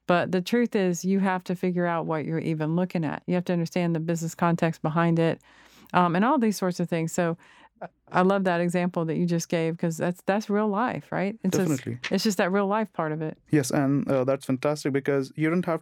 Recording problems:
none

